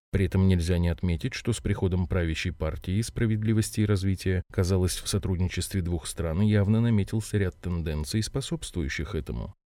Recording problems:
none

